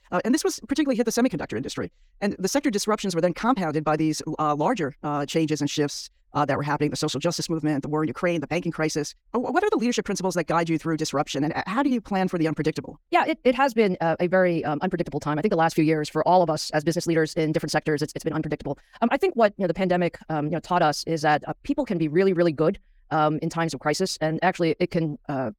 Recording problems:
wrong speed, natural pitch; too fast; 1.6 times normal speed

